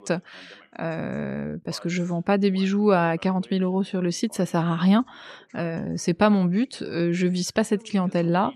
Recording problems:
voice in the background; faint; throughout; 30 dB below the speech

